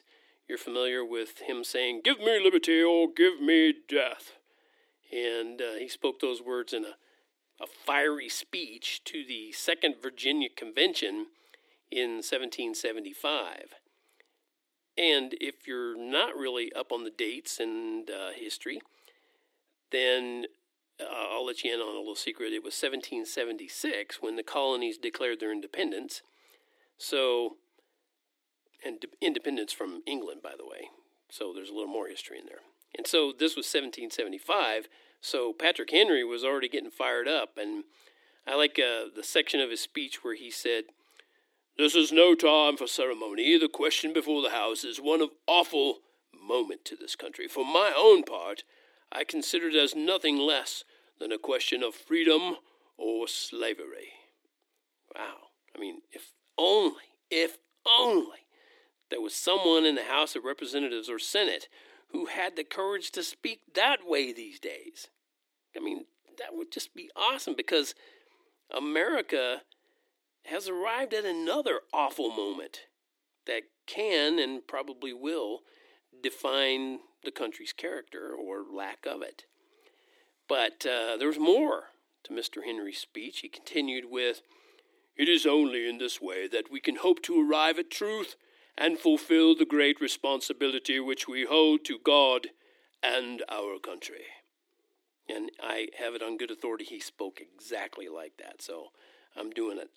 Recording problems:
thin; somewhat; fading below 300 Hz

